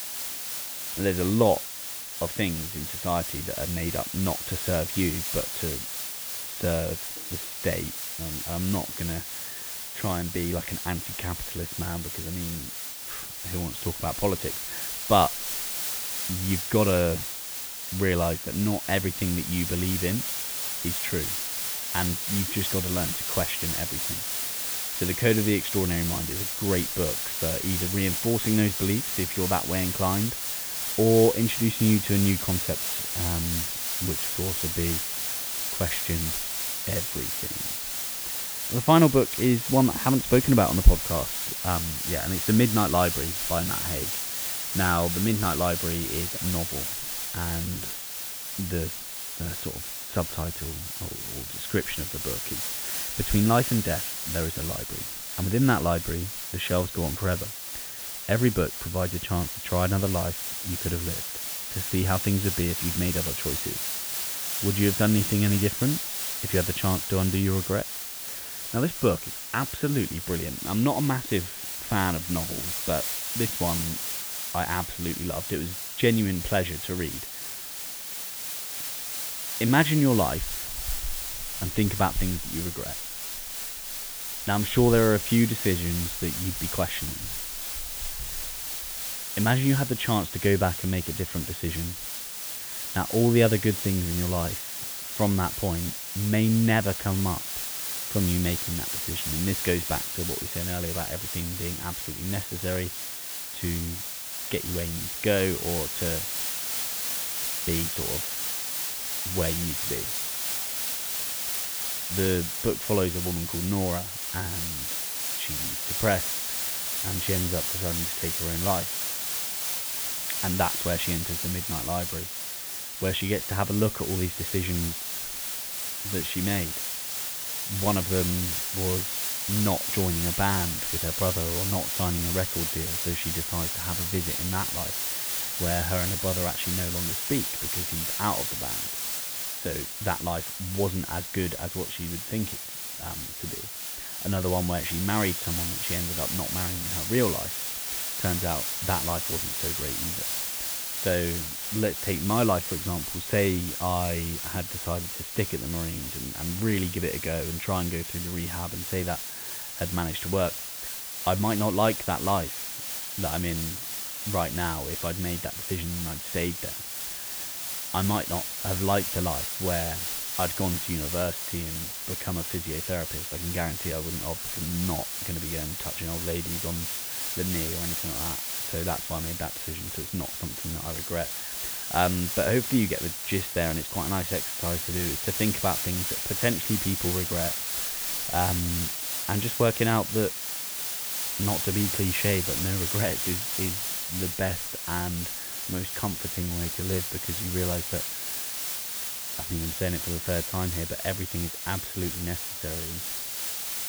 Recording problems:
high frequencies cut off; severe; nothing above 4 kHz
hiss; loud; throughout; 1 dB below the speech

